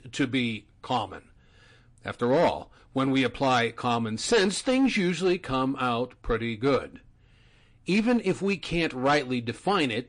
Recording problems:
distortion; slight; 5% of the sound clipped
garbled, watery; slightly; nothing above 8.5 kHz

